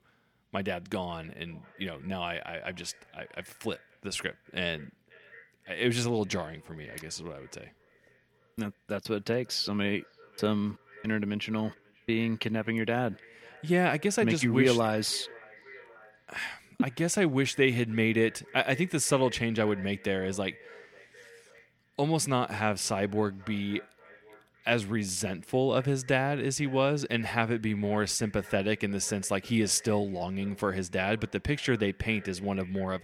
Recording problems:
echo of what is said; faint; throughout; 540 ms later, 25 dB below the speech

